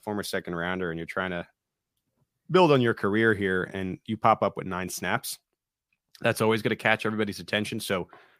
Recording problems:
none

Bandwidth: 15 kHz